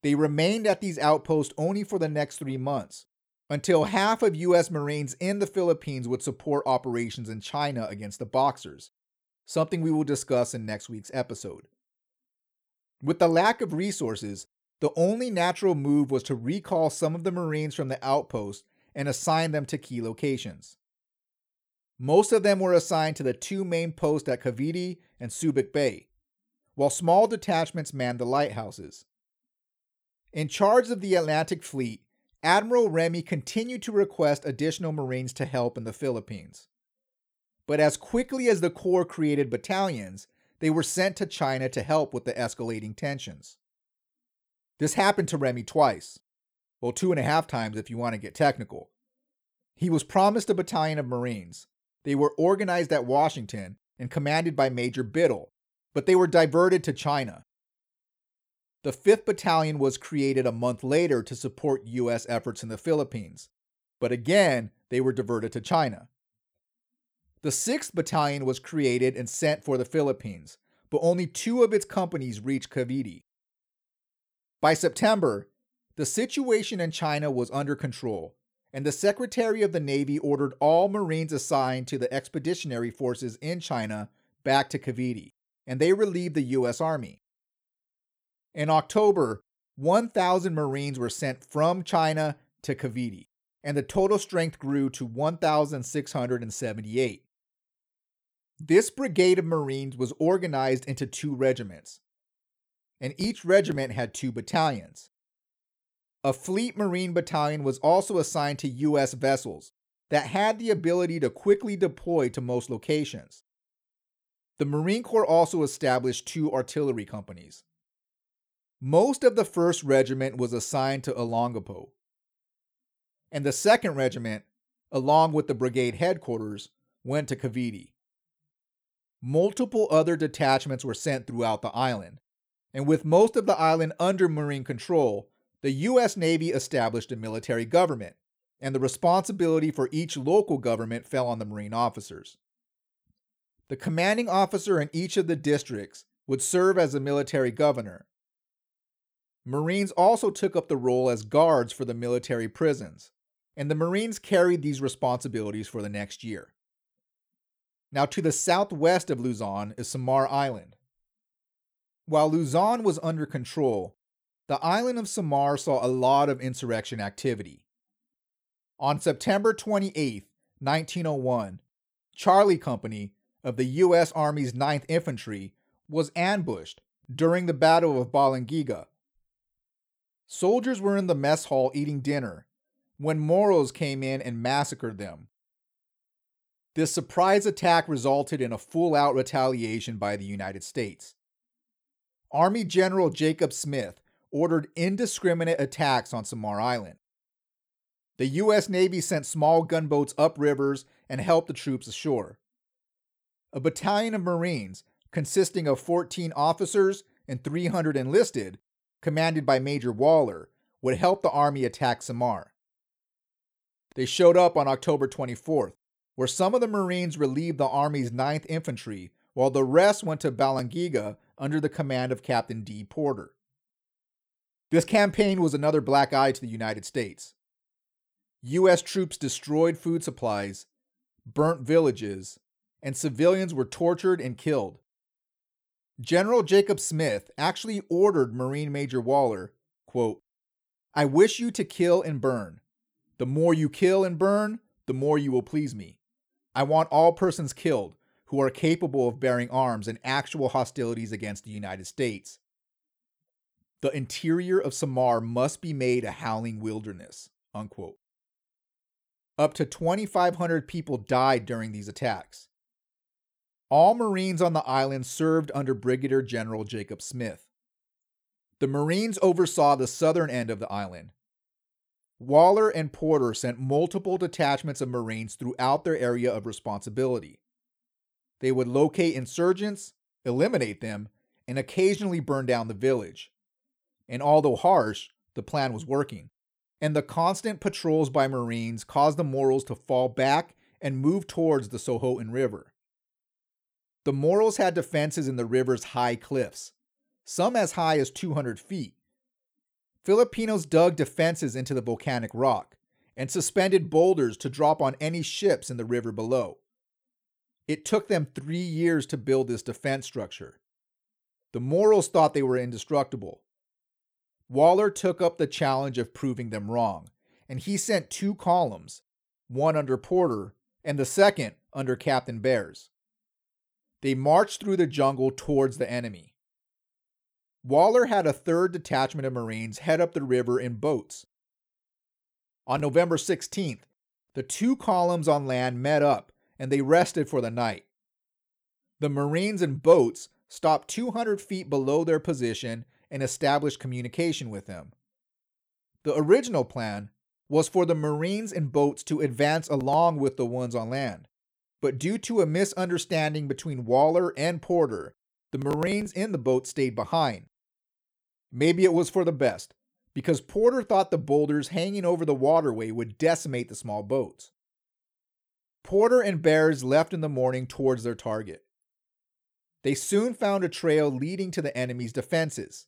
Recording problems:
none

